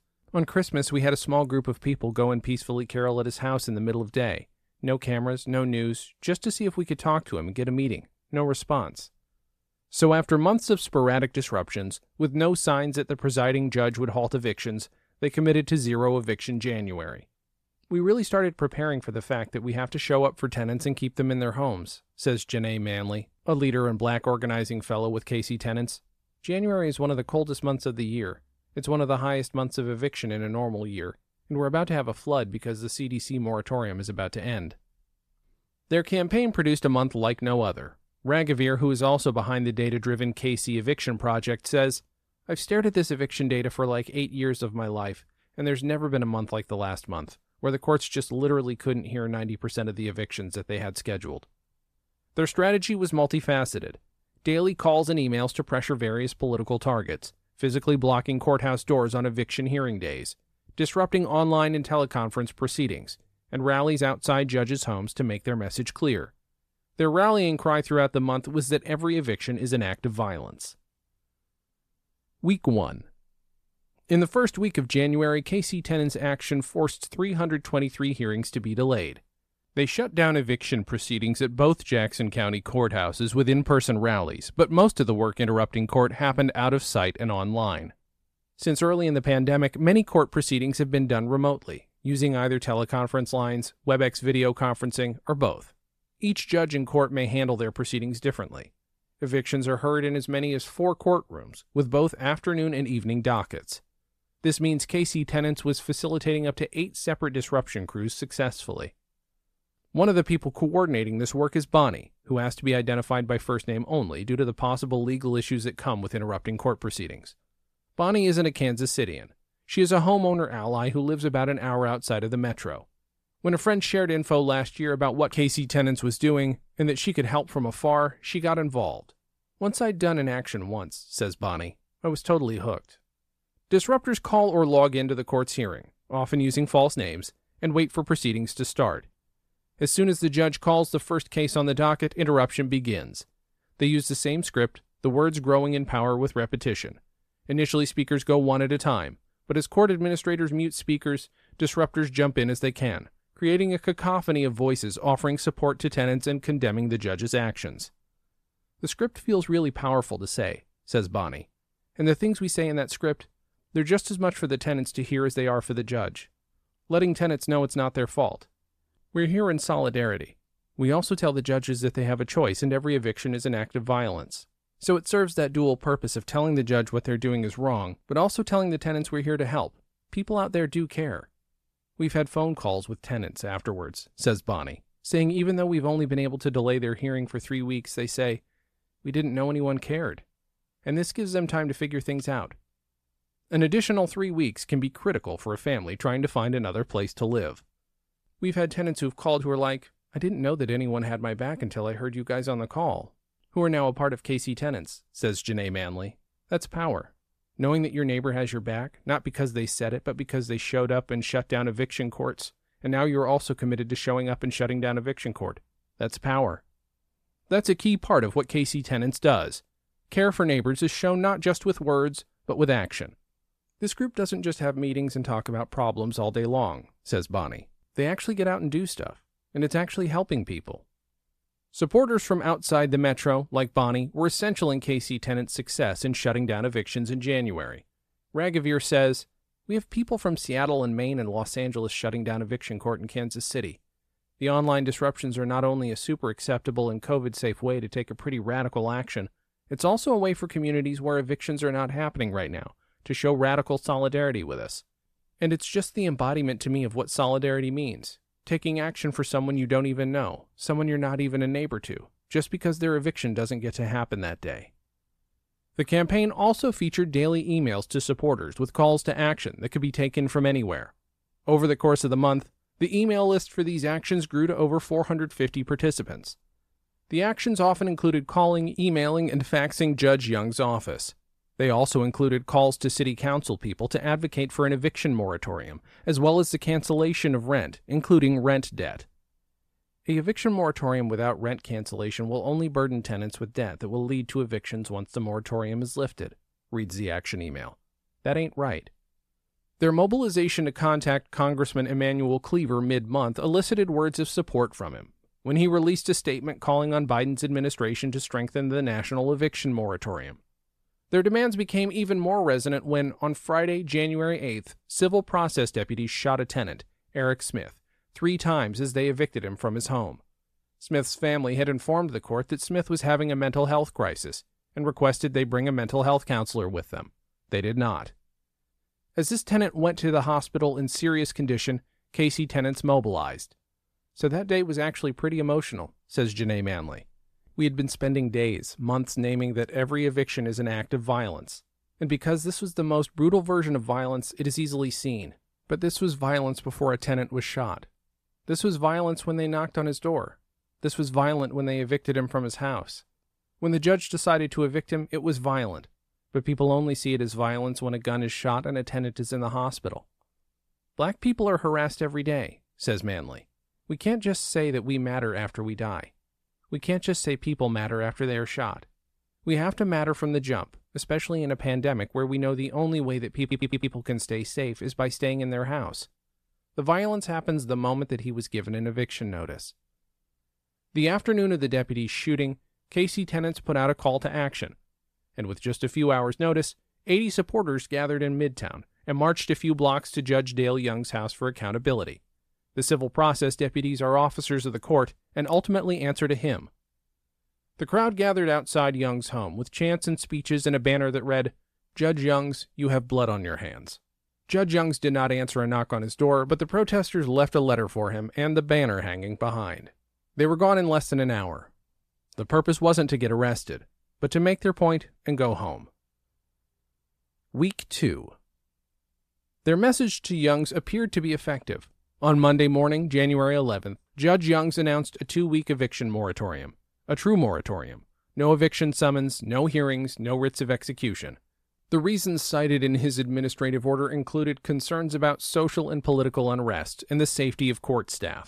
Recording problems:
audio stuttering; at 6:13

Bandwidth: 14.5 kHz